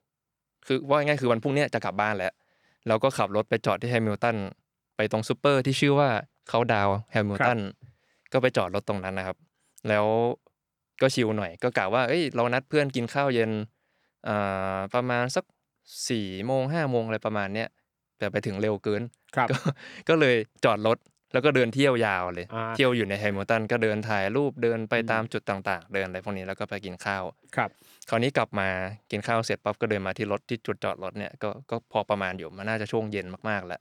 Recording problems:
none

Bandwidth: 18.5 kHz